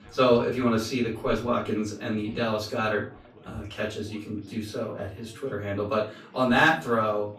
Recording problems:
off-mic speech; far
room echo; slight; dies away in 0.3 s
background chatter; faint; throughout; 4 voices, 25 dB below the speech

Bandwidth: 15 kHz